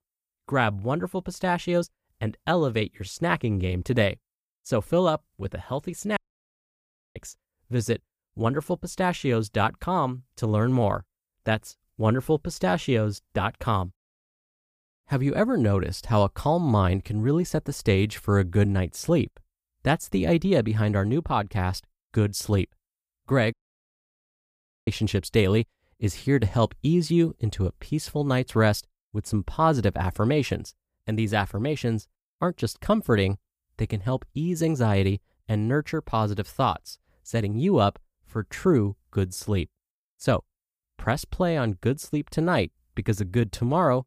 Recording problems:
audio cutting out; at 6 s for 1 s and at 24 s for 1.5 s

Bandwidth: 15 kHz